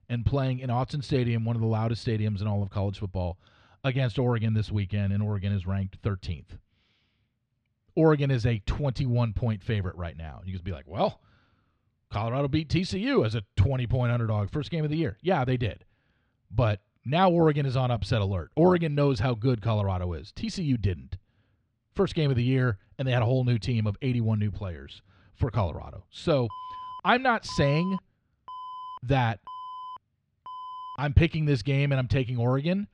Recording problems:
muffled; slightly; fading above 3.5 kHz
alarm; faint; from 27 to 31 s; peak 10 dB below the speech

